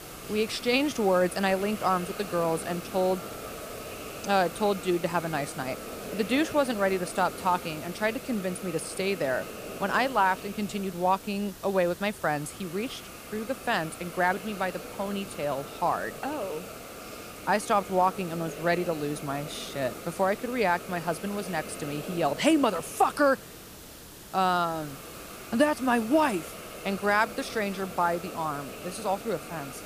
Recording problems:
hiss; noticeable; throughout; 10 dB below the speech

